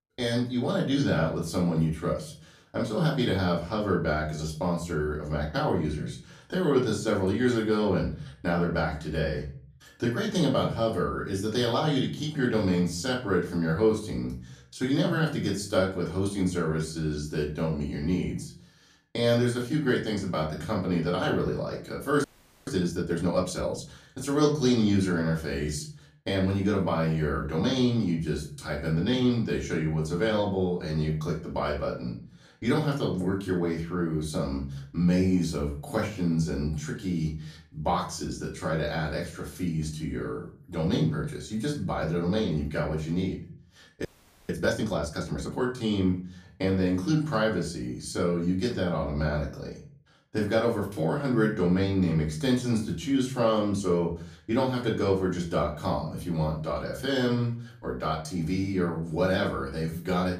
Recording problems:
off-mic speech; far
room echo; slight; dies away in 0.4 s
audio freezing; at 22 s and at 44 s

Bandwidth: 15 kHz